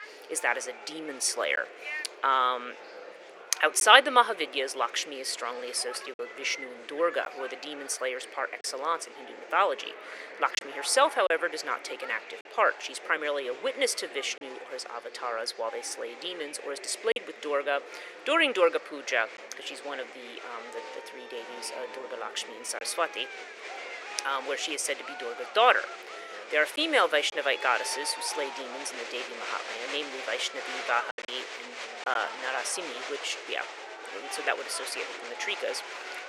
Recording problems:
thin; very; fading below 450 Hz
murmuring crowd; noticeable; throughout; 10 dB below the speech
choppy; occasionally; 1% of the speech affected

